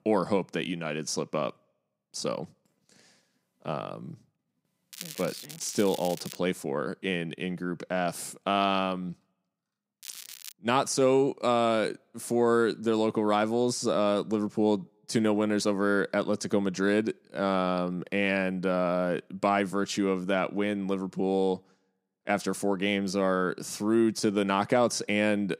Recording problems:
crackling; noticeable; from 5 to 6.5 s and at 10 s; 15 dB below the speech

